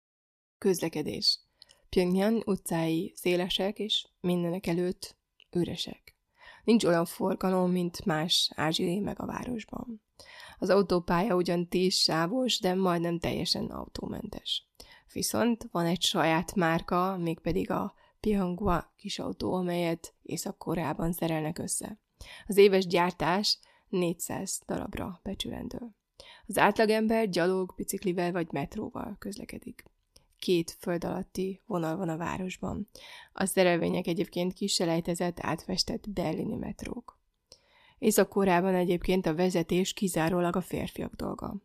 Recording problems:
none

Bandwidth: 14.5 kHz